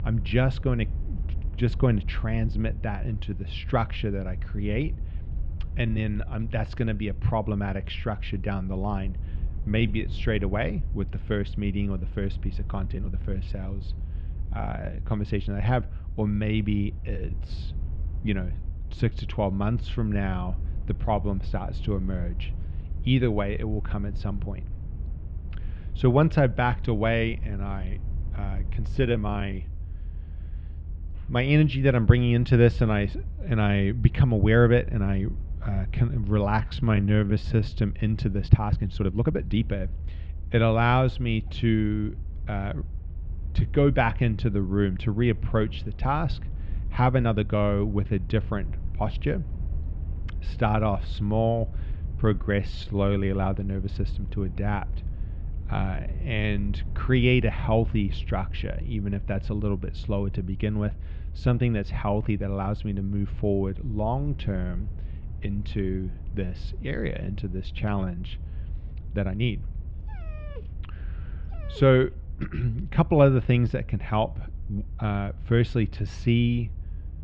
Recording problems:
muffled; very; fading above 3 kHz
low rumble; faint; throughout; 20 dB below the speech
uneven, jittery; strongly; from 5.5 s to 1:10
dog barking; faint; from 1:10 to 1:12; peak 20 dB below the speech

